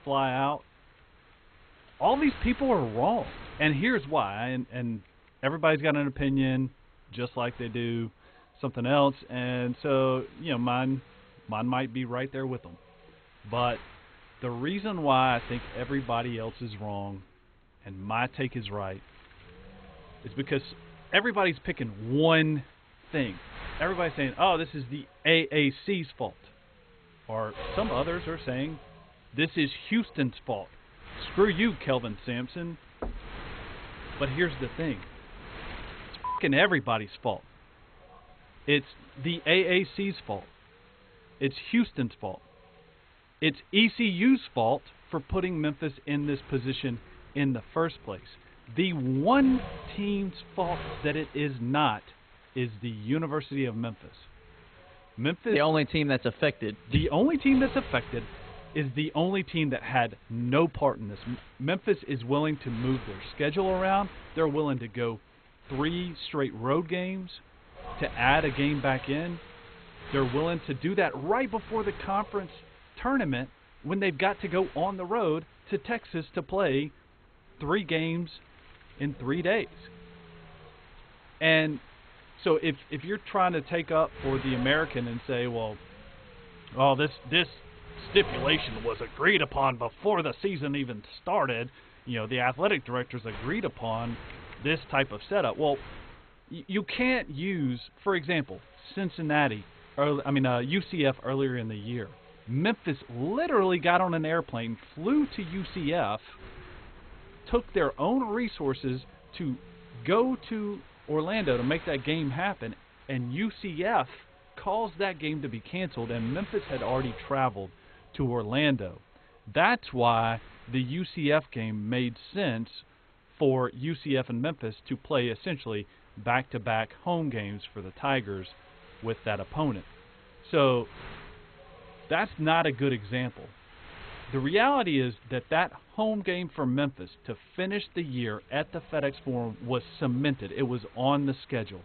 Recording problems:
garbled, watery; badly; nothing above 4 kHz
wind noise on the microphone; occasional gusts; 20 dB below the speech
door banging; faint; at 33 s; peak 10 dB below the speech

